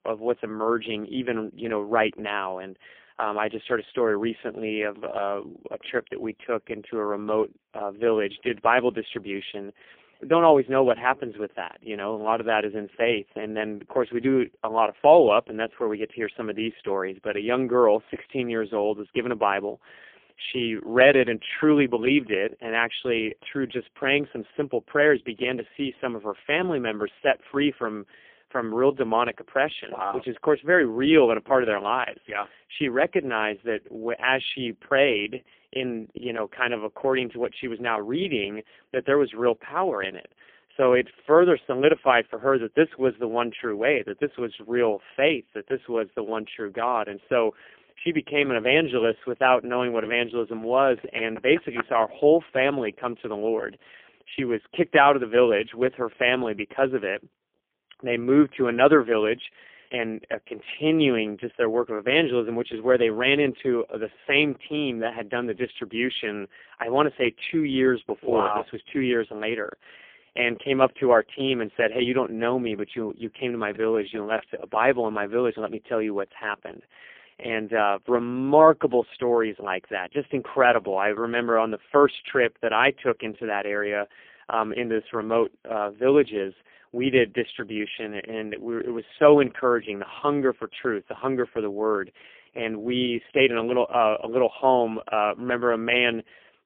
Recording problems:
phone-call audio; poor line; nothing above 3.5 kHz

